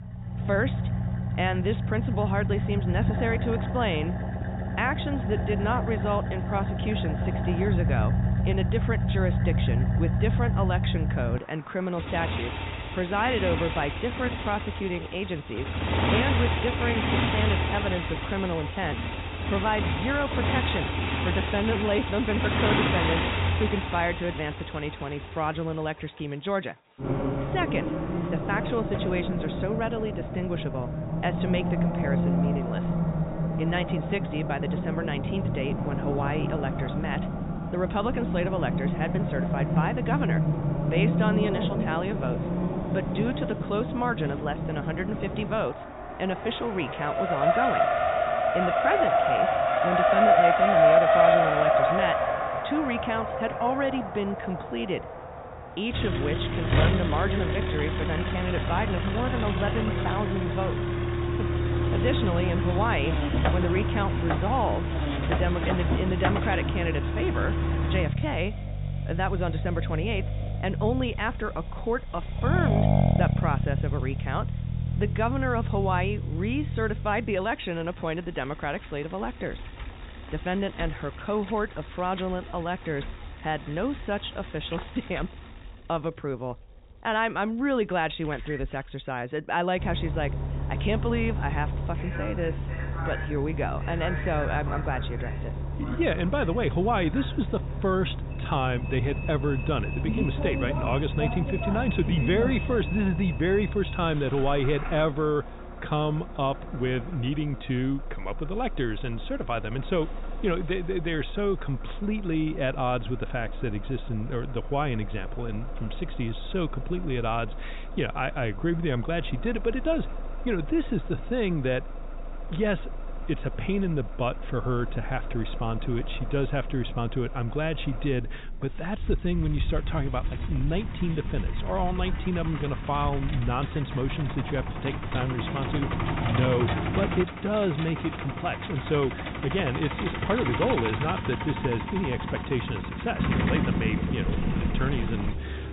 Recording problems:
high frequencies cut off; severe; nothing above 4 kHz
traffic noise; very loud; throughout; 1 dB above the speech

